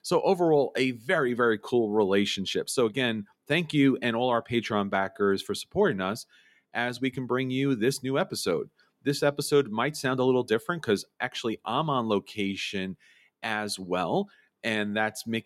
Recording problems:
none

